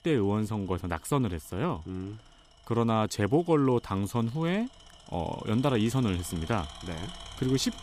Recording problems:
machinery noise; noticeable; throughout; 20 dB below the speech

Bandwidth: 14.5 kHz